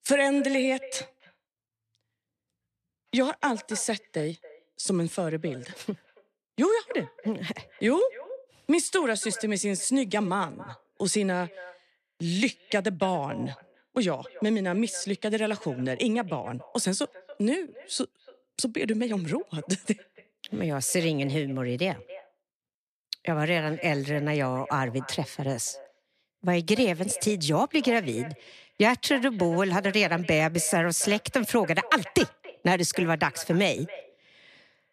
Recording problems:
echo of what is said; faint; throughout; 280 ms later, 20 dB below the speech

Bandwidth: 14.5 kHz